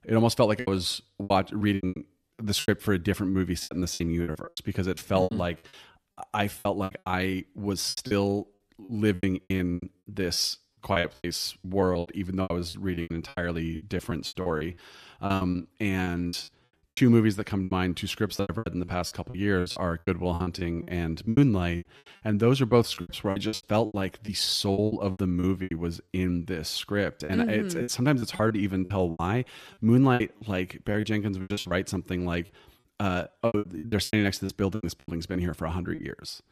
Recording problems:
choppy; very; 17% of the speech affected

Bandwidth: 14.5 kHz